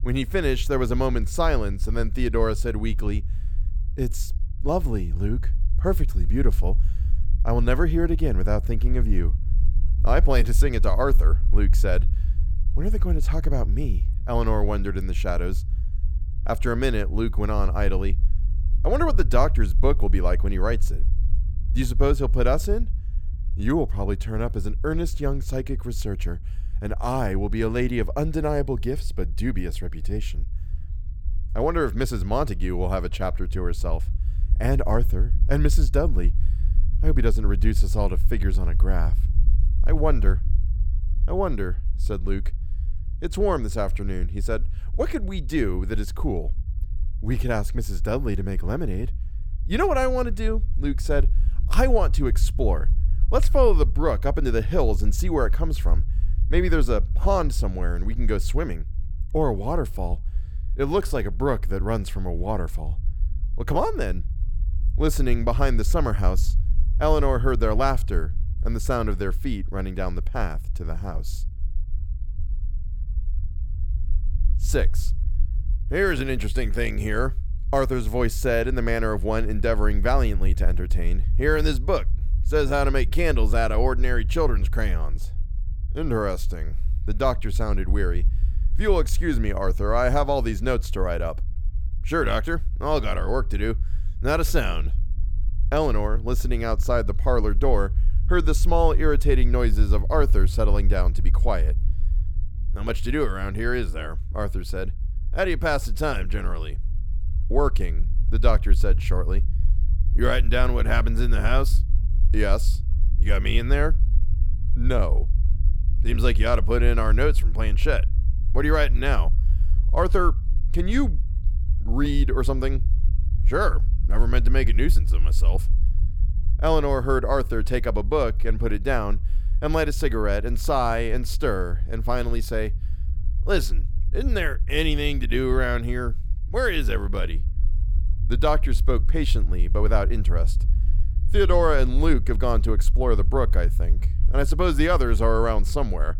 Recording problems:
low rumble; faint; throughout; 20 dB below the speech

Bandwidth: 18.5 kHz